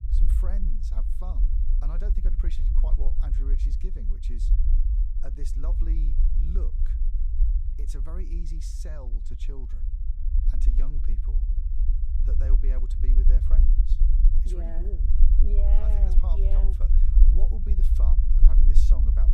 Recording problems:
low rumble; loud; throughout; 2 dB below the speech

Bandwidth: 15 kHz